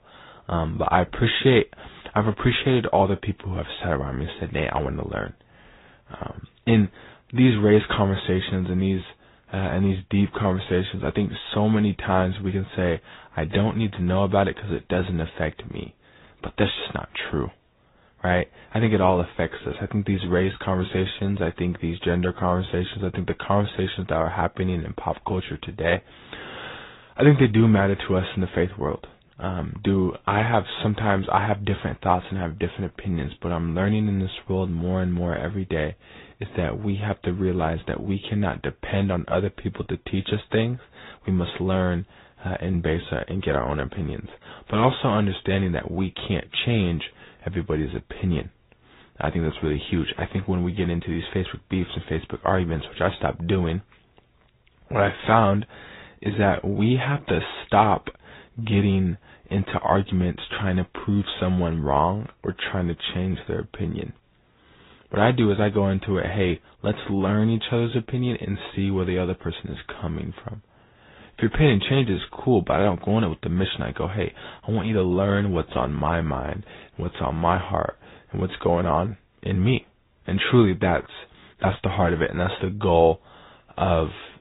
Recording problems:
high frequencies cut off; severe; nothing above 4 kHz
garbled, watery; slightly

